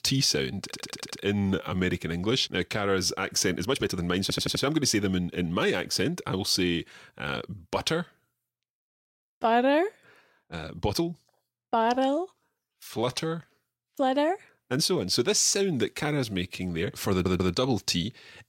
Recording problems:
audio stuttering; at 0.5 s, at 4 s and at 17 s
uneven, jittery; strongly; from 1.5 to 17 s

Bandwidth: 16 kHz